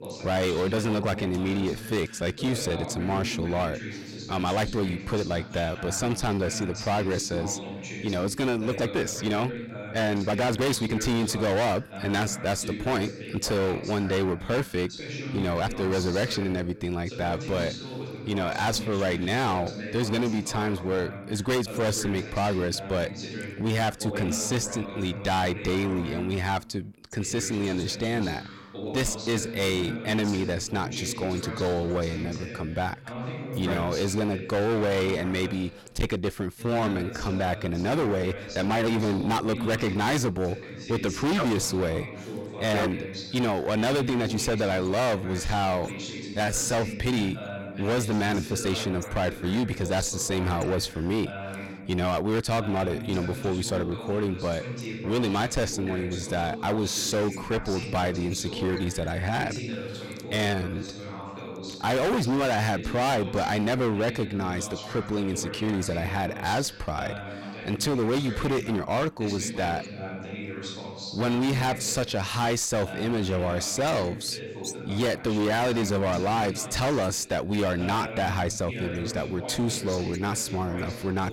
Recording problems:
distortion; heavy; 20% of the sound clipped
voice in the background; loud; throughout; 9 dB below the speech
uneven, jittery; strongly; from 2 s to 1:09

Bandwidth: 16.5 kHz